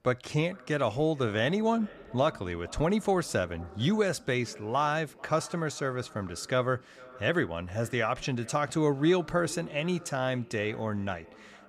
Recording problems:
echo of what is said; faint; throughout; 440 ms later, 20 dB below the speech

